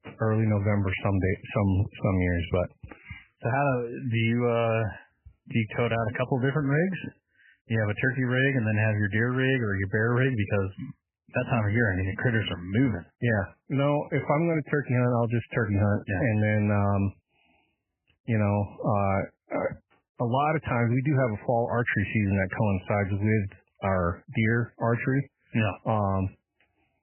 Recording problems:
garbled, watery; badly; nothing above 3 kHz

